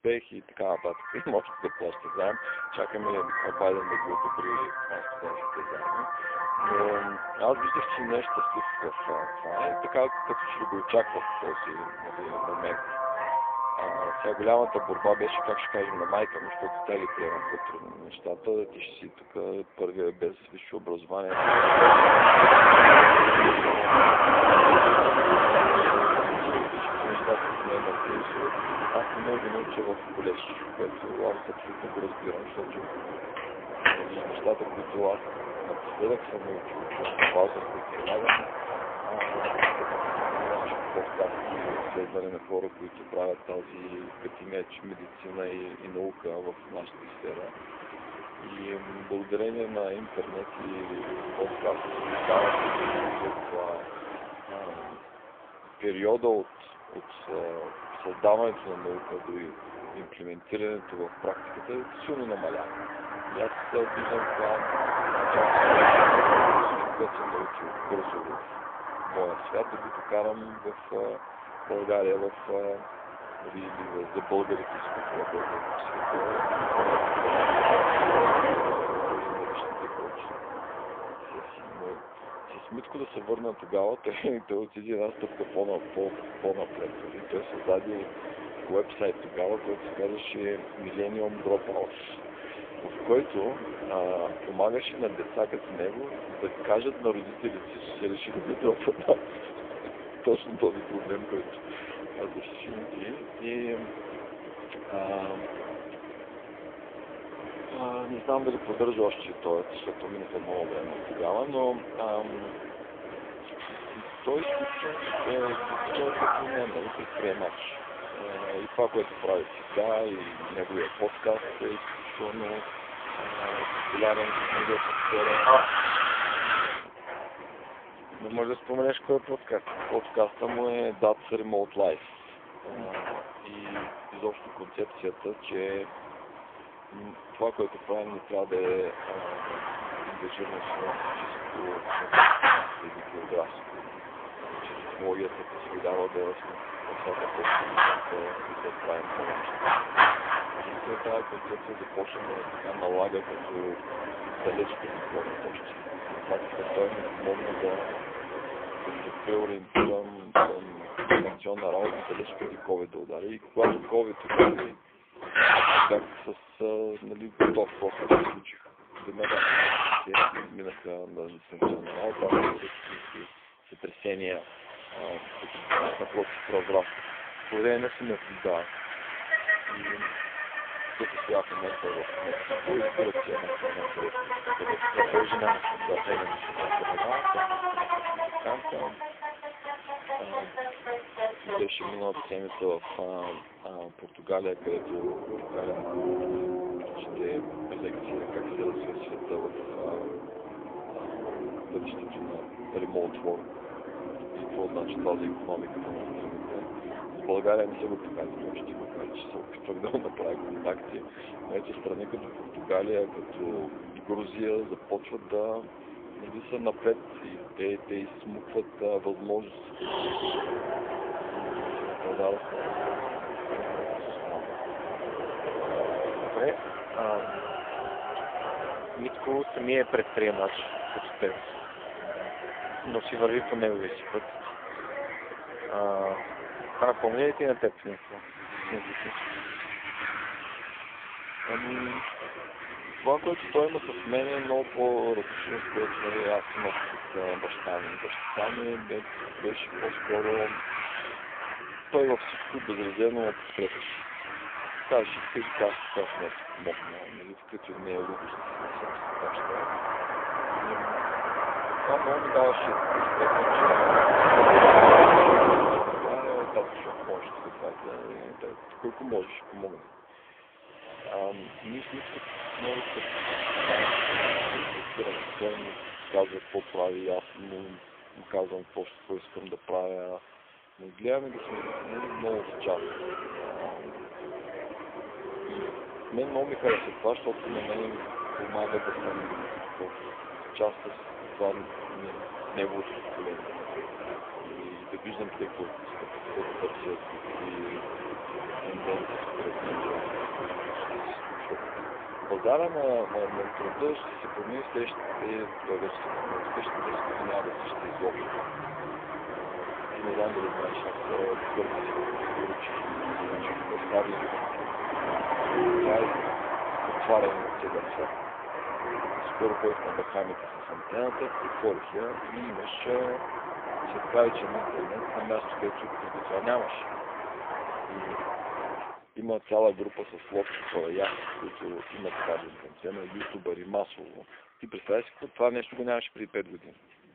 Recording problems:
phone-call audio; poor line; nothing above 3.5 kHz
traffic noise; very loud; throughout; 4 dB above the speech

